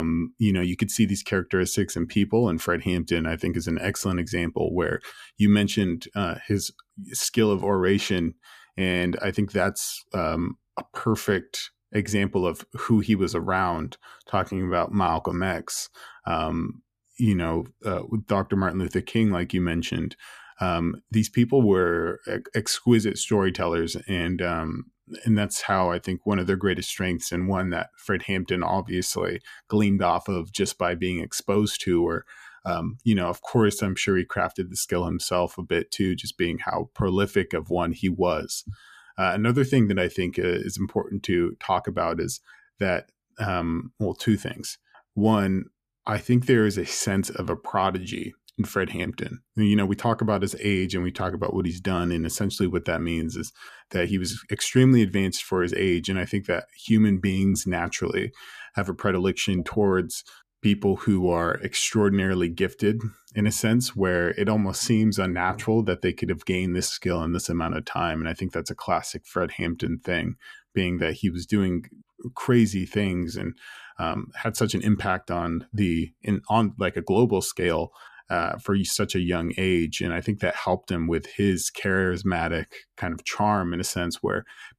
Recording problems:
abrupt cut into speech; at the start

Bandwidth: 14.5 kHz